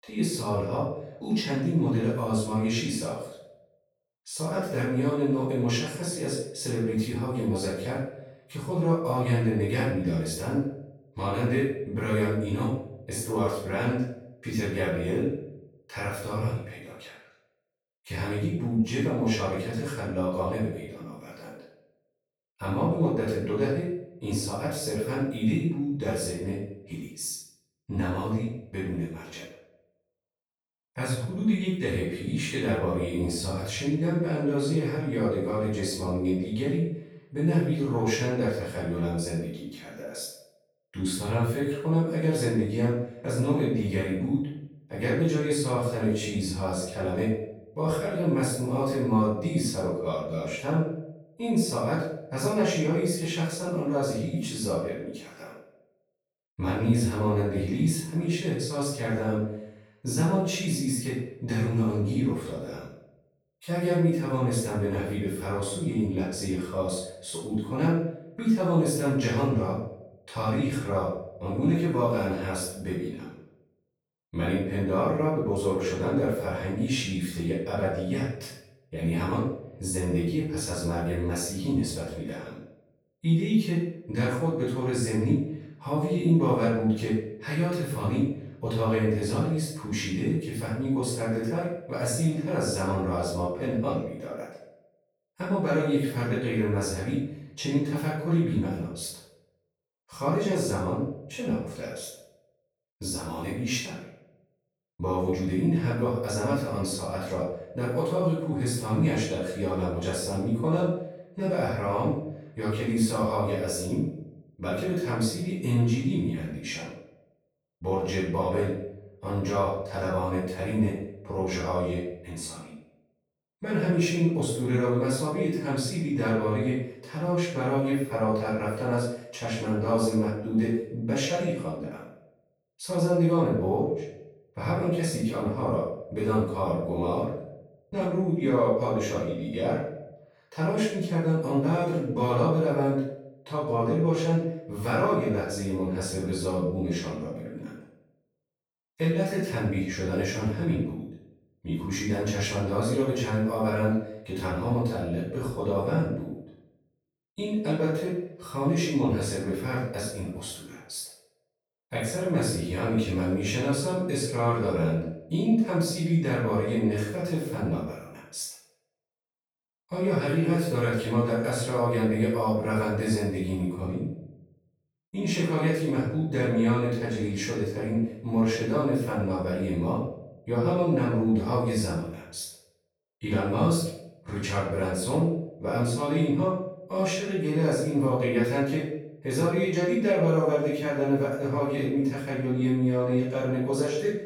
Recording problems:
off-mic speech; far
room echo; noticeable; dies away in 0.6 s

